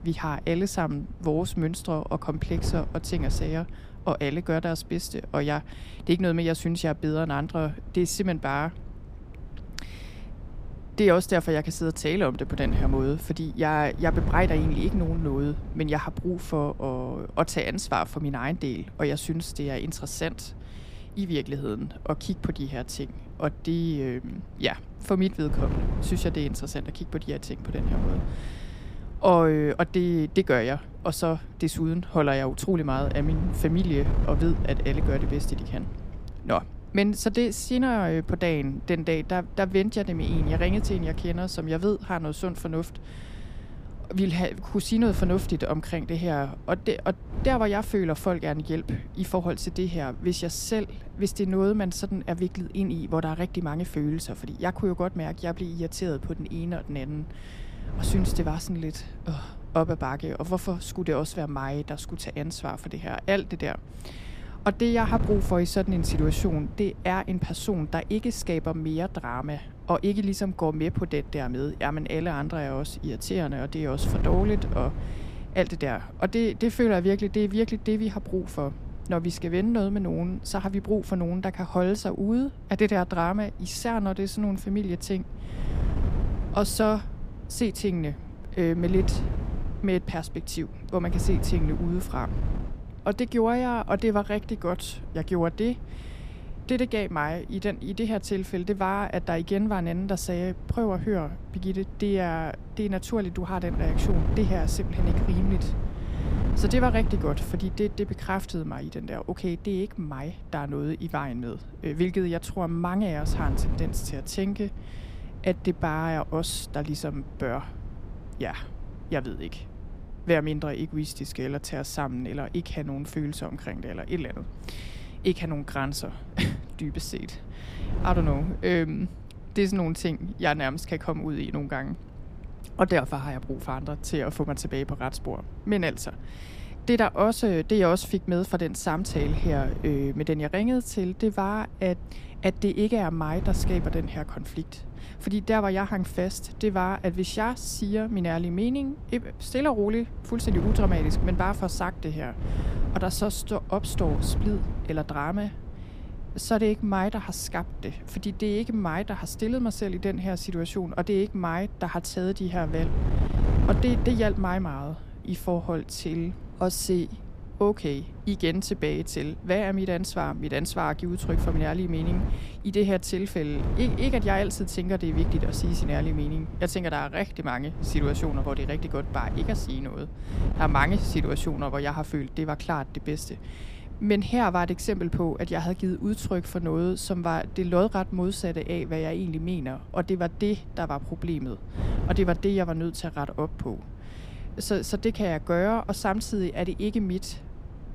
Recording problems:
wind noise on the microphone; occasional gusts; 15 dB below the speech

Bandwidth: 15 kHz